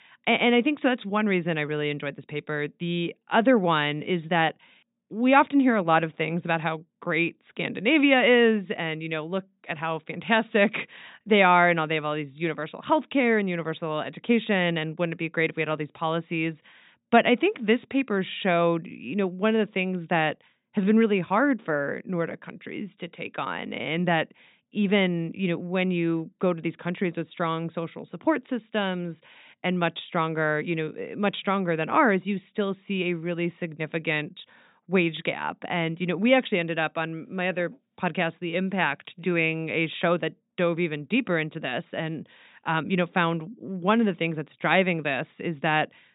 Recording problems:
high frequencies cut off; severe; nothing above 4 kHz

